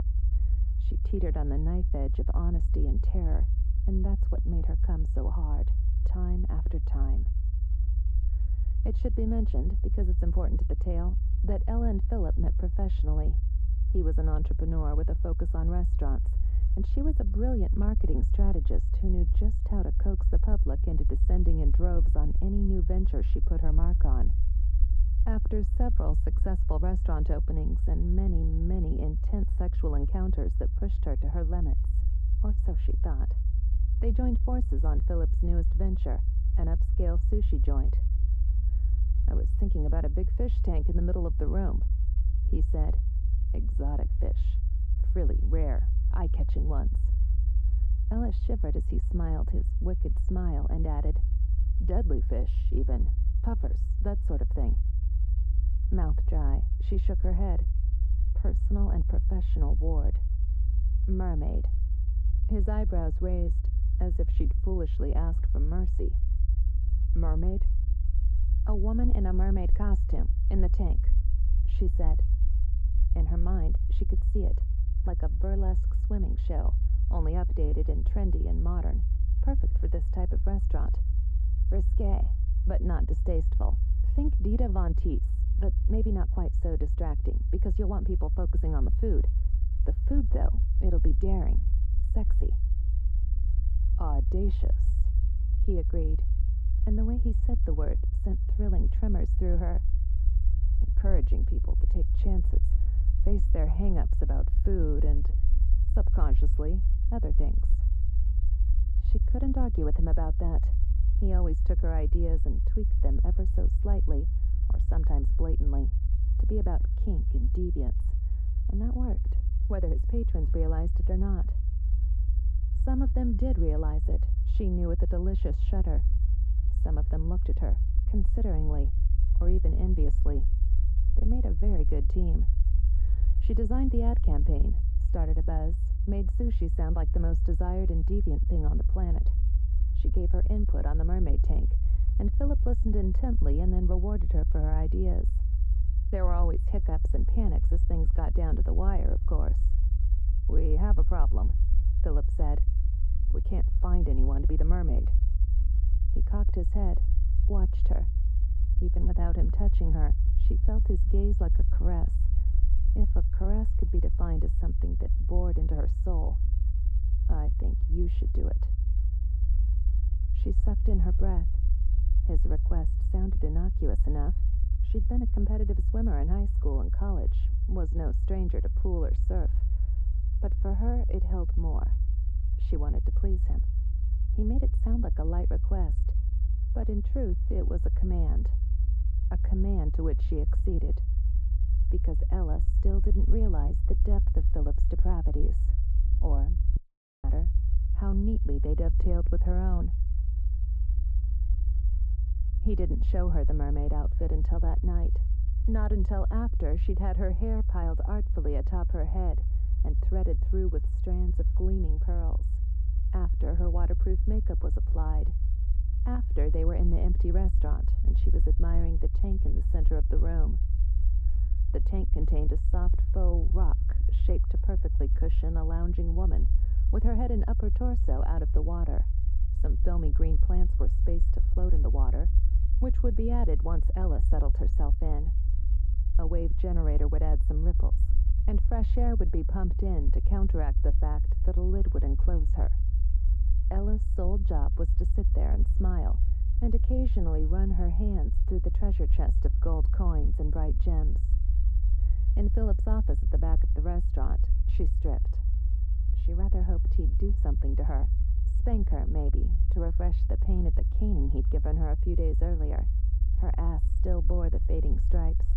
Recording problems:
muffled; very; fading above 2.5 kHz
low rumble; loud; throughout; 9 dB below the speech
audio cutting out; at 3:17

